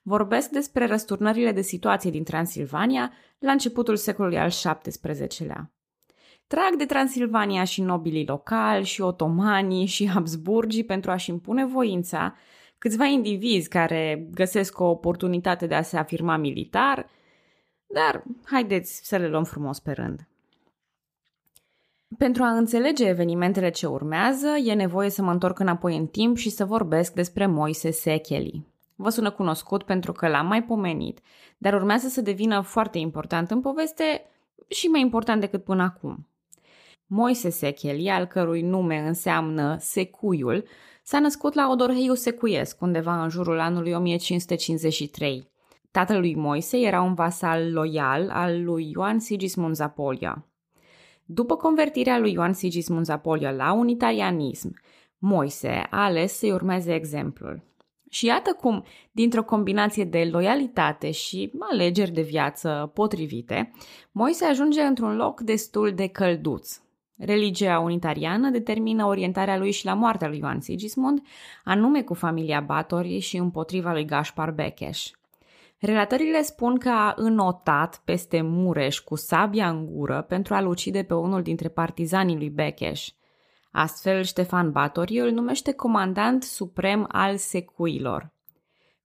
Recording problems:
none

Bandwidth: 15 kHz